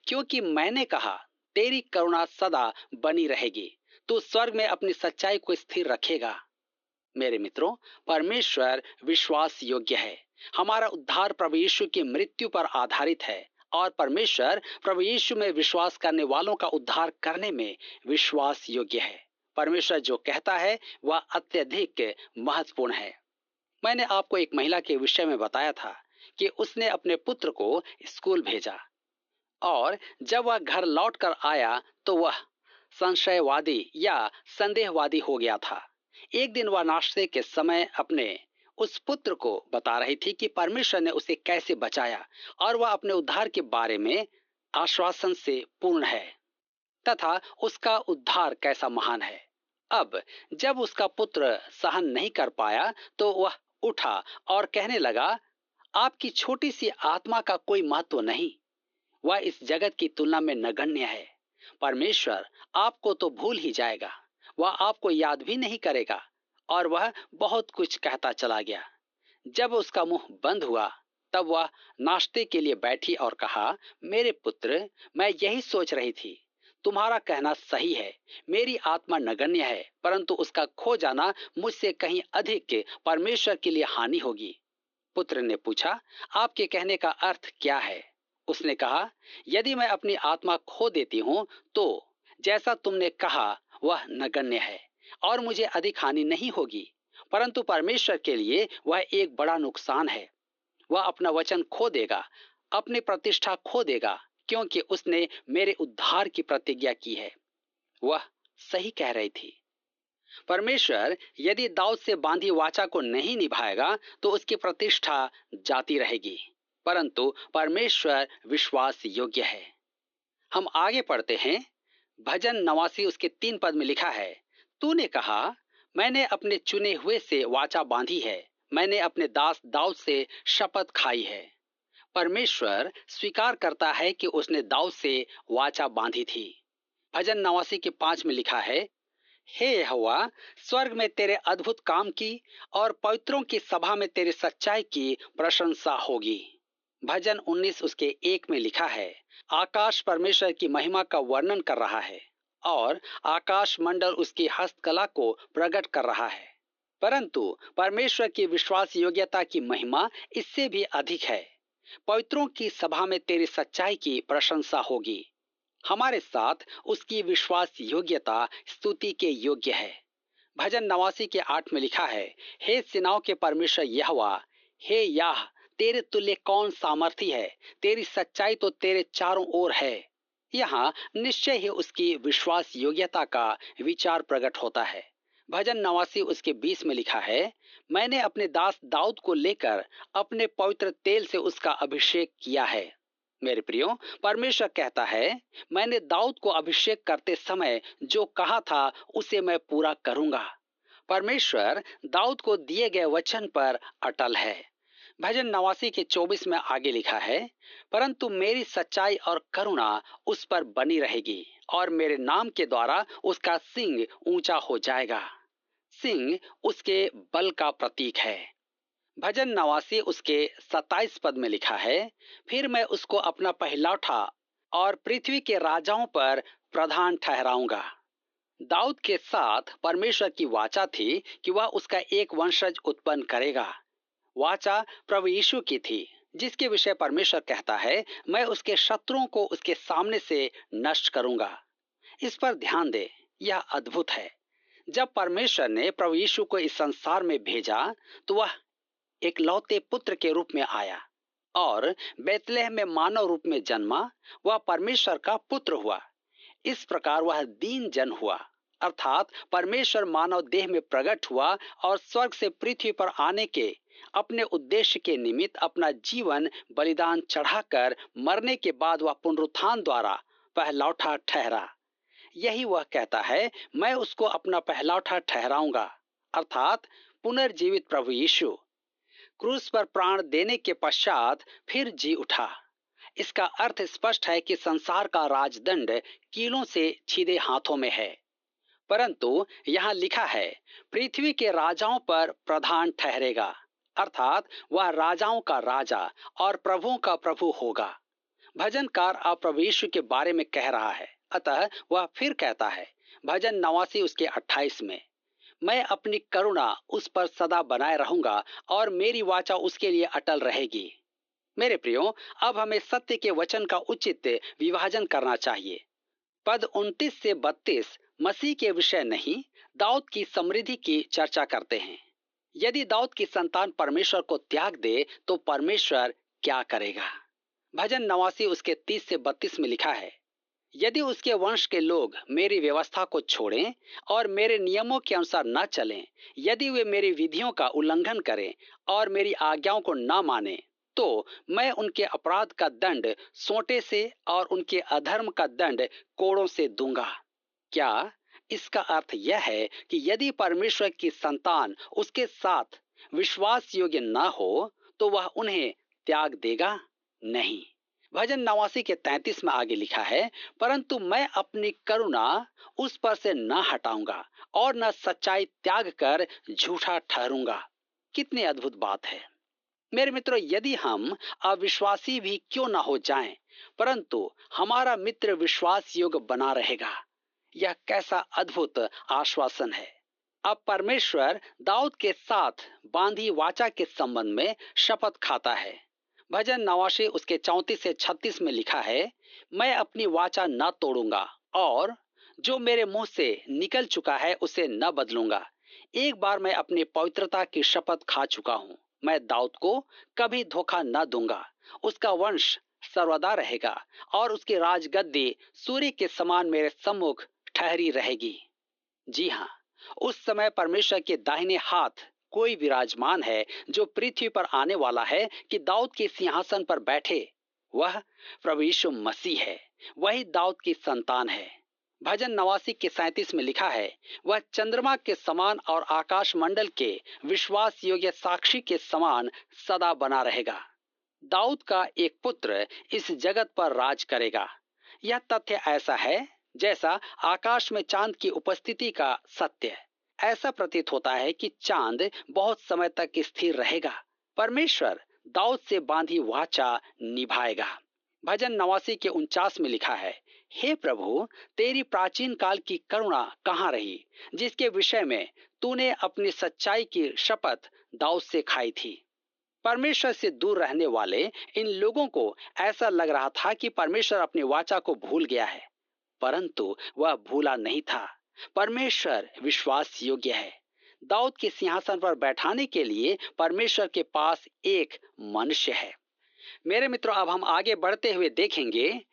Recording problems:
thin; somewhat; fading below 300 Hz
high frequencies cut off; noticeable; nothing above 6.5 kHz
muffled; very slightly; fading above 3 kHz

